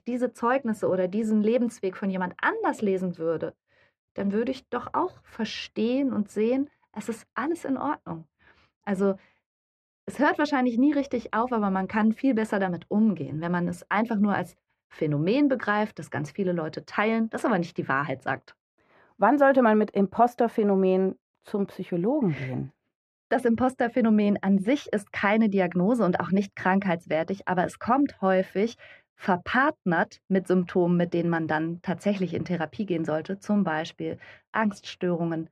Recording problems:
muffled; very; fading above 3.5 kHz

